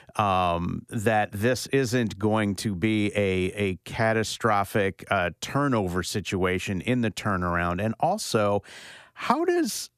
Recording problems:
none

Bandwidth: 14.5 kHz